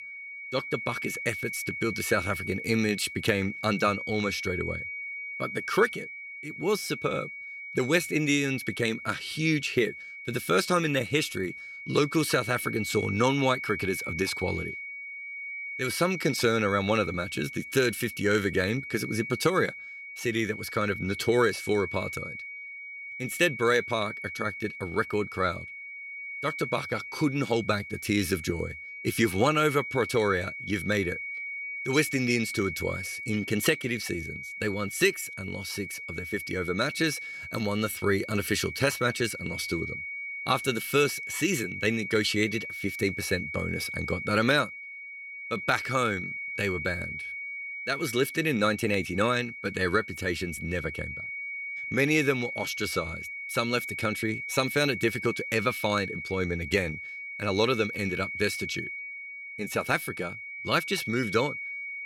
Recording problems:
high-pitched whine; loud; throughout; 2 kHz, 7 dB below the speech

